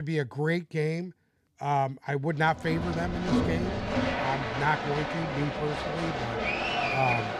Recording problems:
crowd noise; very loud; from 3 s on; as loud as the speech
abrupt cut into speech; at the start

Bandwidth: 14.5 kHz